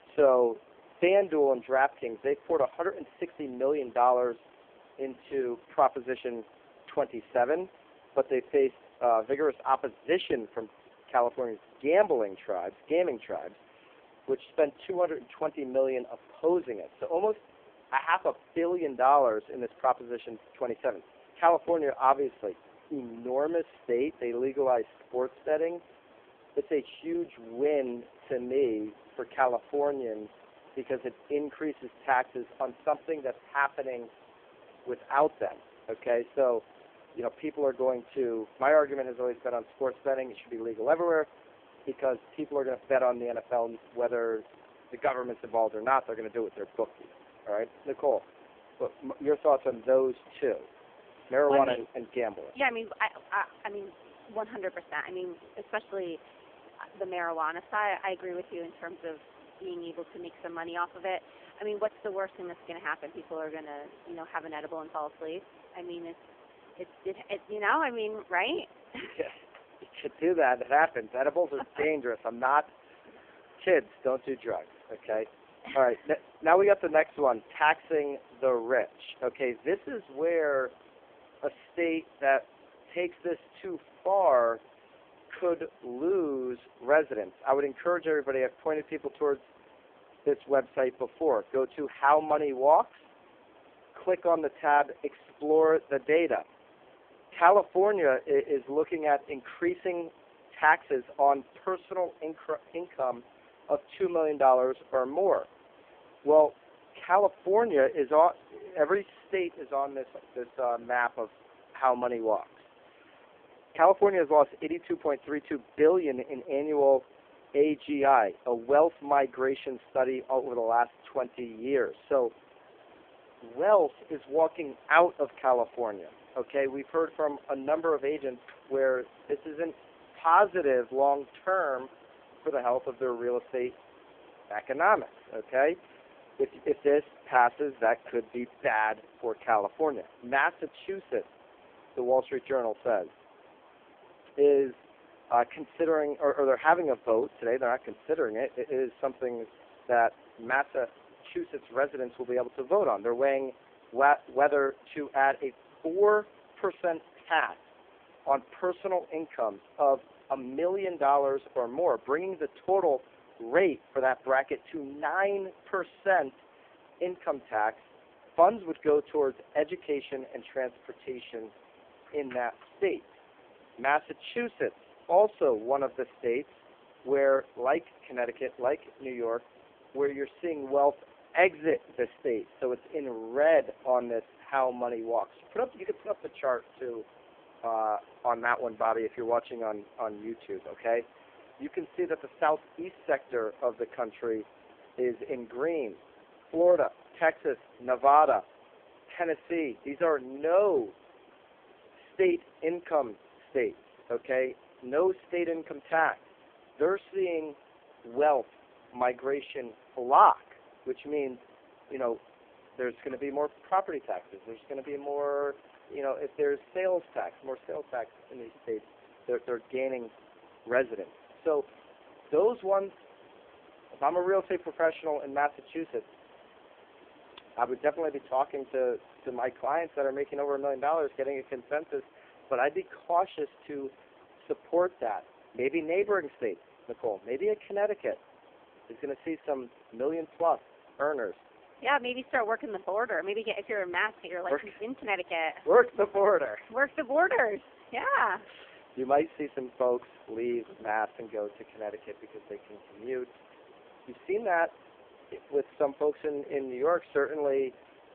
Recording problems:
phone-call audio; poor line
hiss; faint; throughout; 25 dB below the speech

